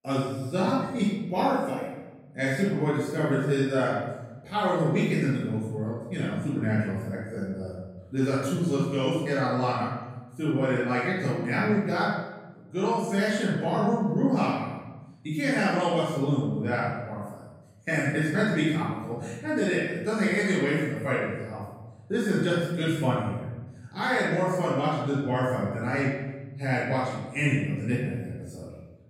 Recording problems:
room echo; strong; dies away in 1.3 s
off-mic speech; far

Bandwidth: 16 kHz